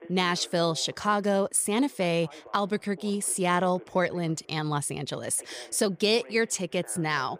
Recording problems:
voice in the background; faint; throughout; 25 dB below the speech

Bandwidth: 15 kHz